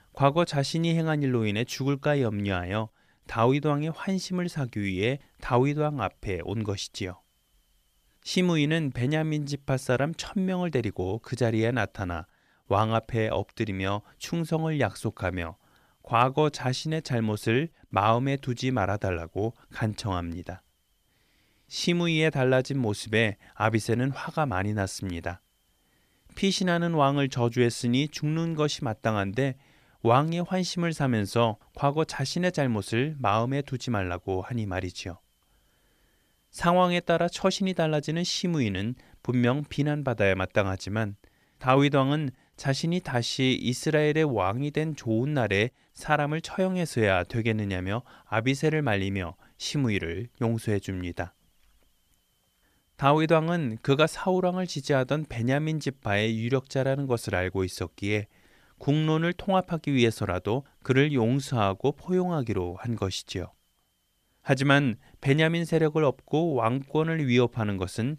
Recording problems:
none

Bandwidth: 14.5 kHz